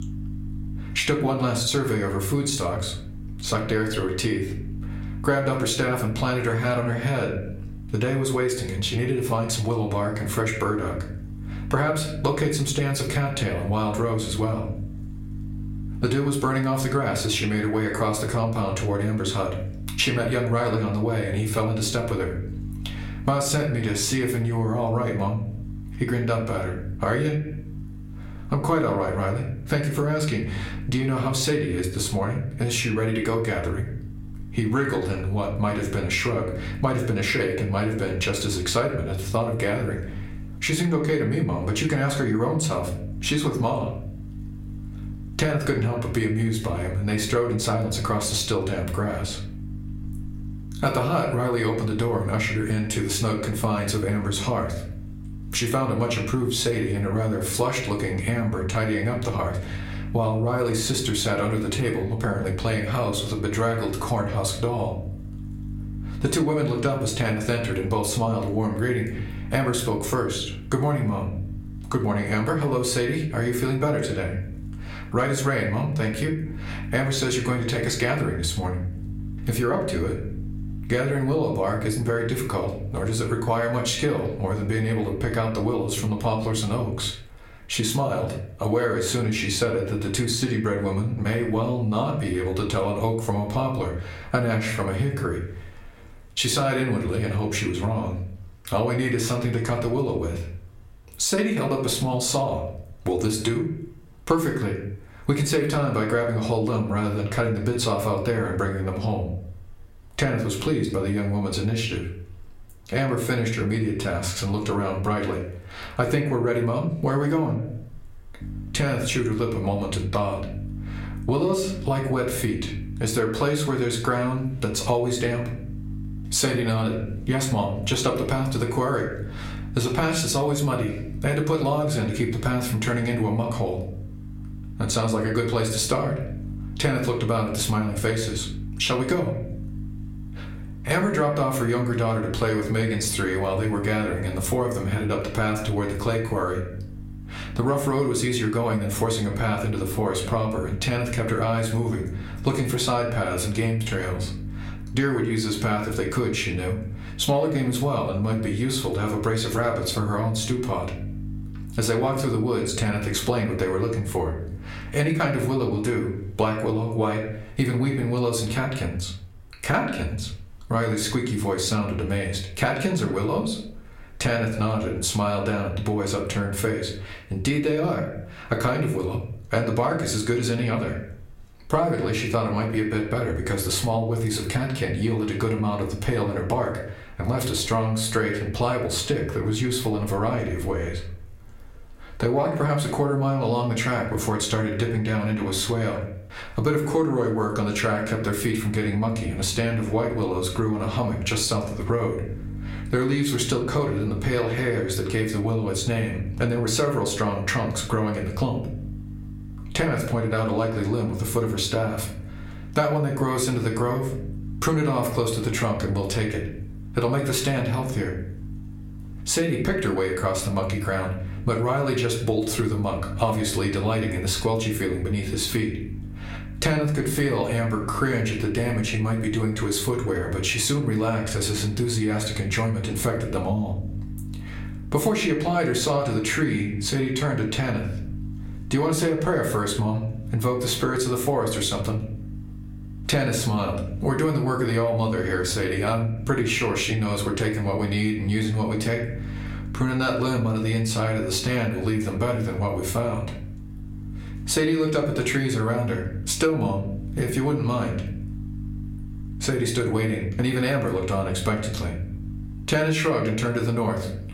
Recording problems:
room echo; slight; dies away in 0.4 s
off-mic speech; somewhat distant
squashed, flat; somewhat
electrical hum; faint; until 1:27, from 1:58 to 2:46 and from 3:18 on; 50 Hz, 25 dB below the speech

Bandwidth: 16 kHz